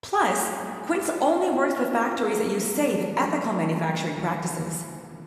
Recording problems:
room echo; noticeable; dies away in 2.3 s
off-mic speech; somewhat distant

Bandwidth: 13.5 kHz